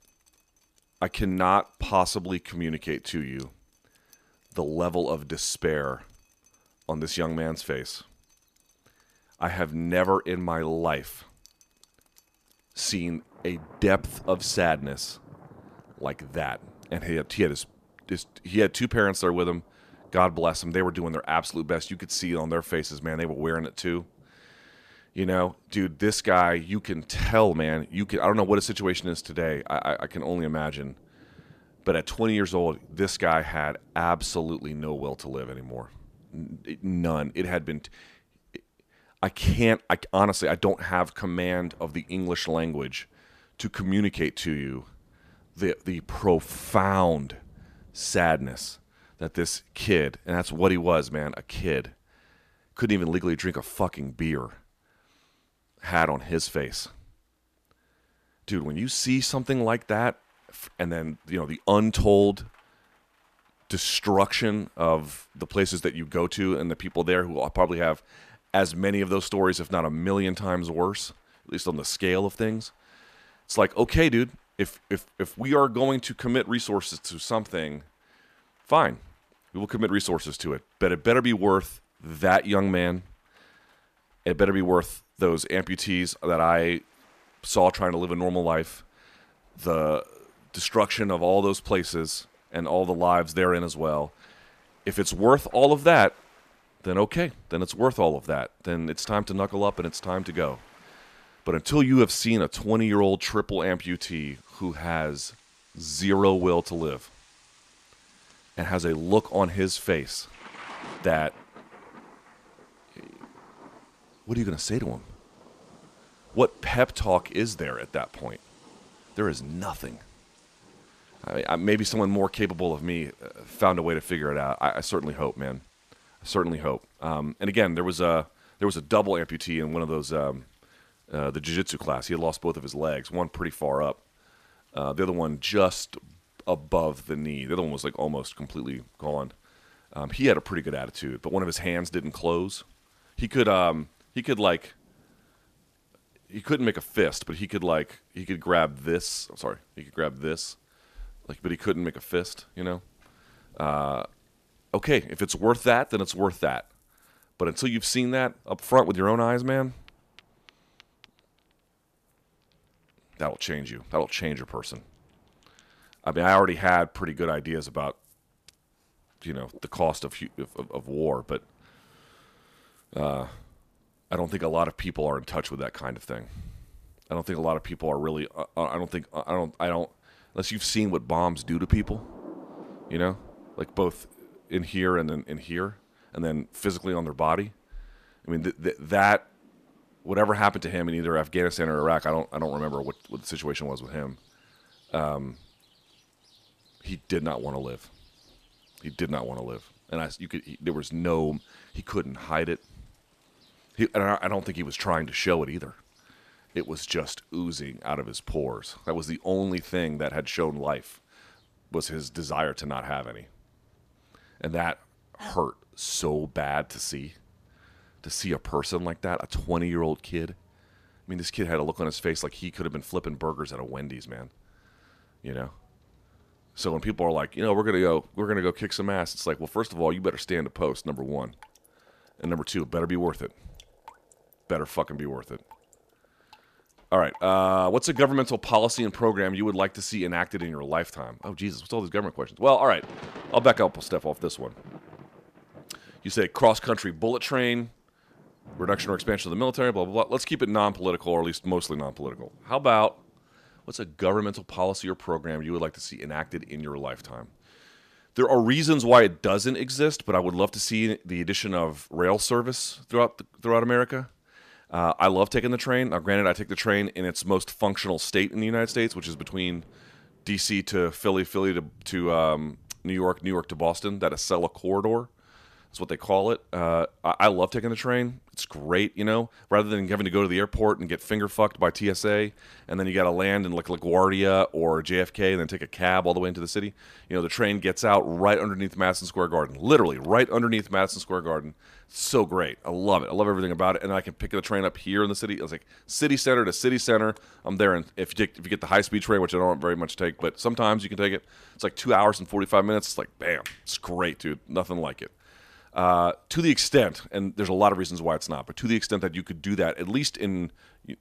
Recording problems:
rain or running water; faint; throughout; 30 dB below the speech

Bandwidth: 14.5 kHz